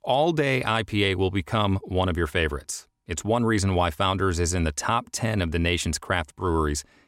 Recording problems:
none

